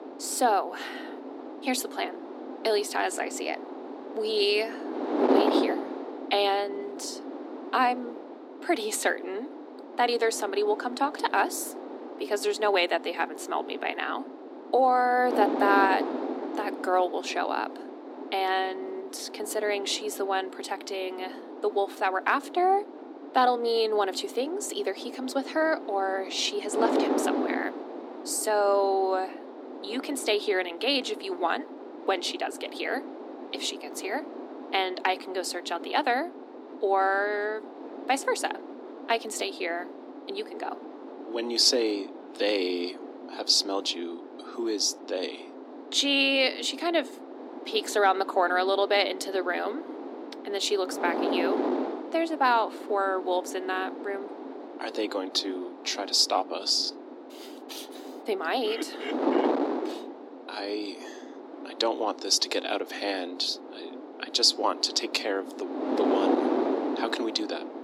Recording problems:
thin; somewhat; fading below 250 Hz
wind noise on the microphone; heavy; 10 dB below the speech

